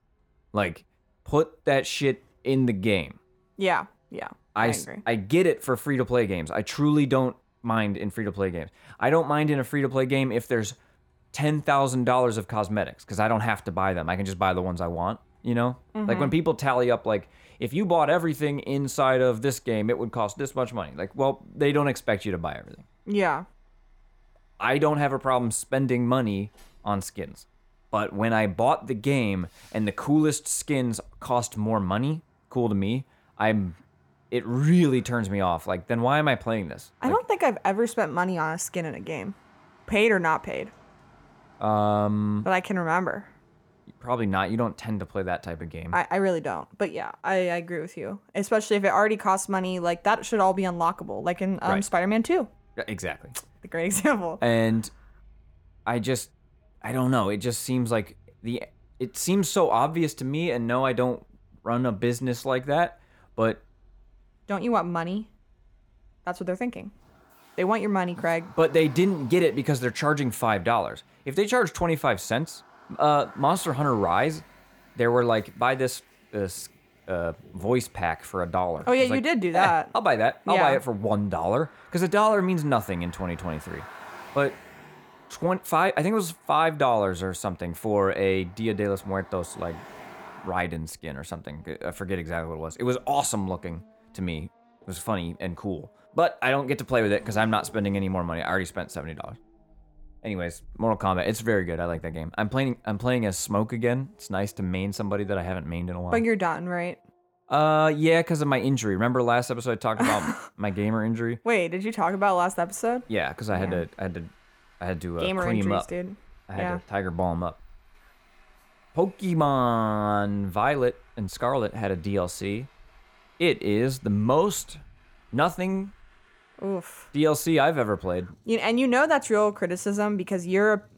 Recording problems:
traffic noise; faint; throughout; 30 dB below the speech

